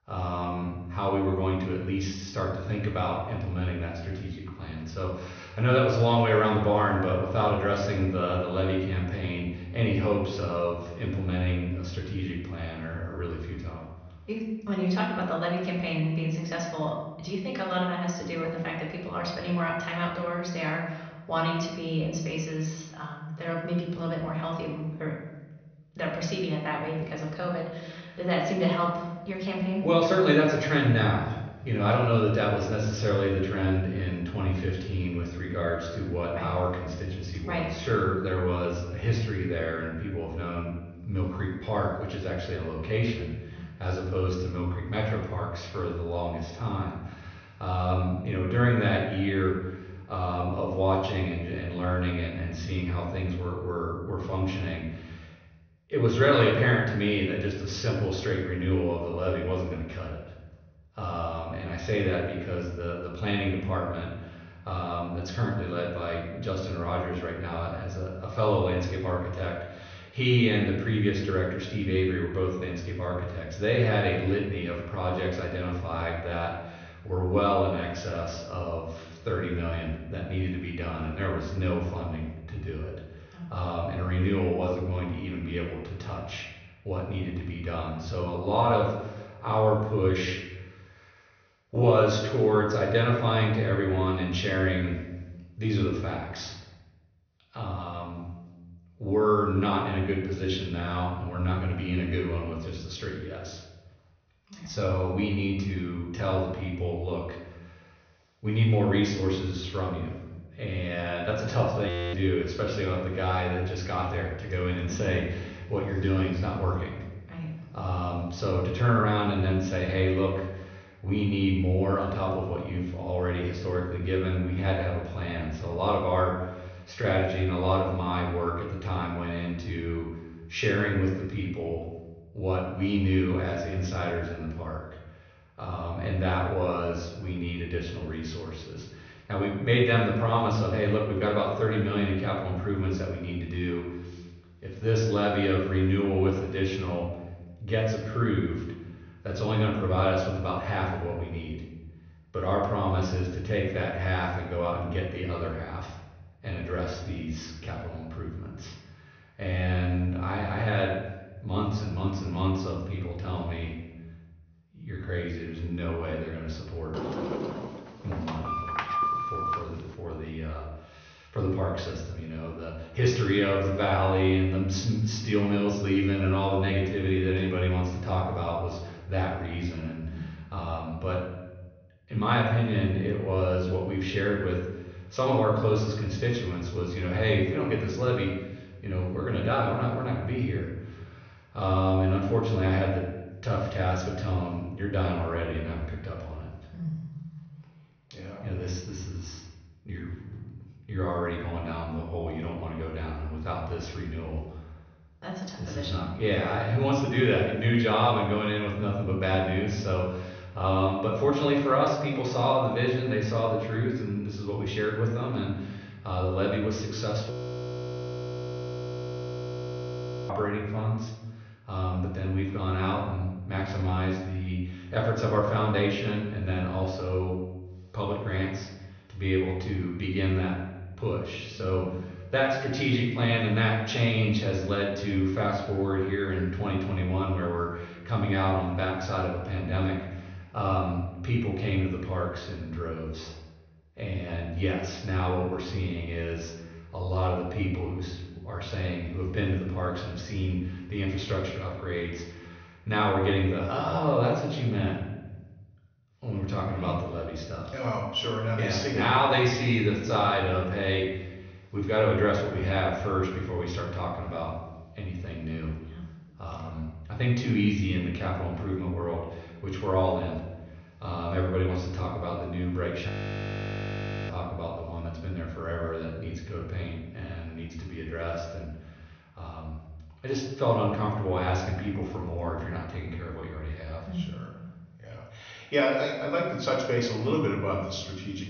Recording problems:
off-mic speech; far
room echo; noticeable; dies away in 1 s
high frequencies cut off; noticeable; nothing above 6.5 kHz
audio freezing; at 1:52, at 3:37 for 3 s and at 4:33 for 1 s
door banging; loud; from 2:47 to 2:50; peak 2 dB above the speech

